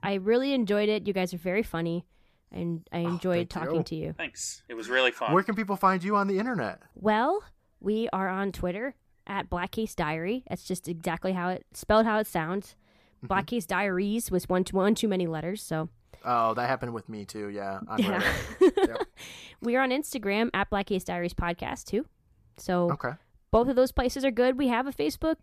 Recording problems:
none

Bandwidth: 14.5 kHz